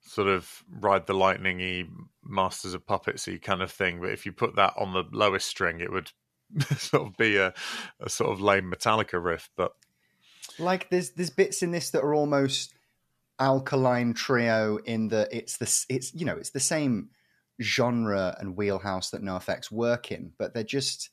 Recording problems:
none

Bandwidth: 14.5 kHz